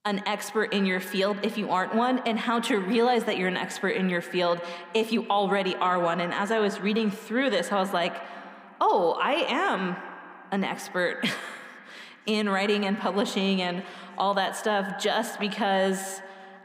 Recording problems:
echo of what is said; strong; throughout; 80 ms later, 10 dB below the speech

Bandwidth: 15.5 kHz